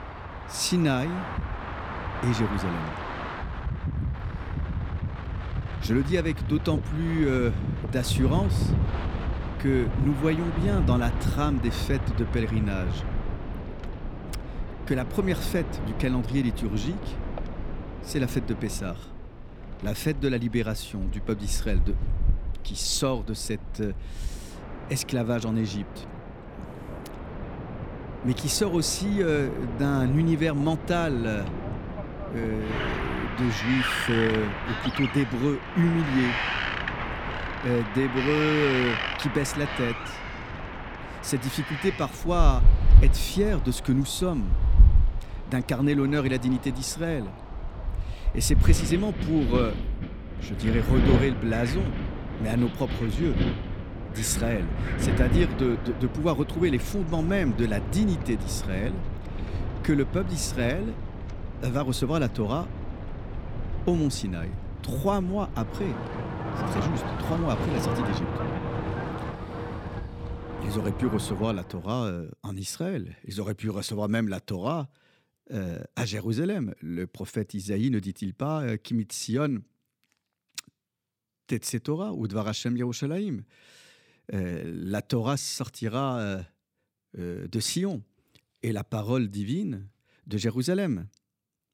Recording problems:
wind in the background; loud; until 1:11; 3 dB below the speech

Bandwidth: 17 kHz